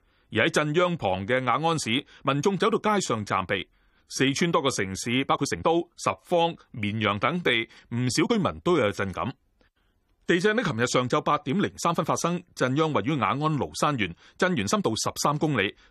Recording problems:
uneven, jittery; strongly; from 1 to 15 s

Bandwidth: 15 kHz